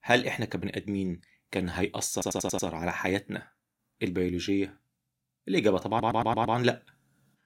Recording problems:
audio stuttering; at 2 s and at 6 s

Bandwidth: 16.5 kHz